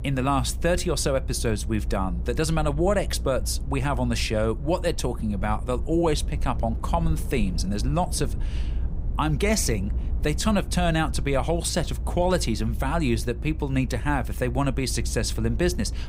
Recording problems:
low rumble; noticeable; throughout; 20 dB below the speech

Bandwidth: 15.5 kHz